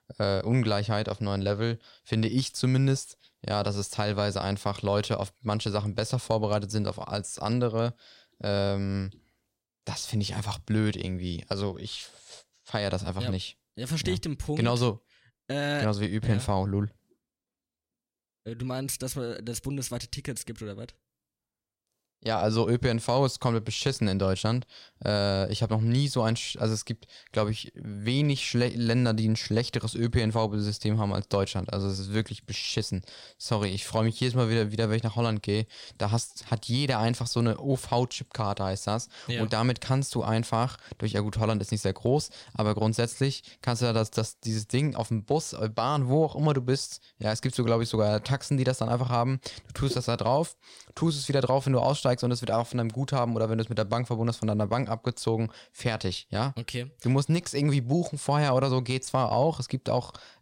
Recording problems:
none

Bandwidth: 16 kHz